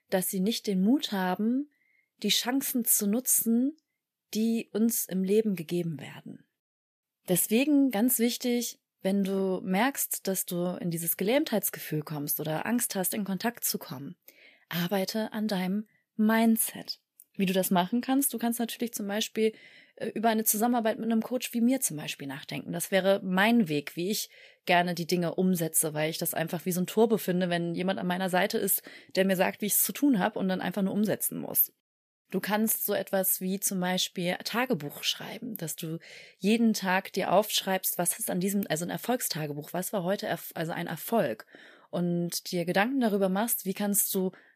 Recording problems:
none

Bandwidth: 14.5 kHz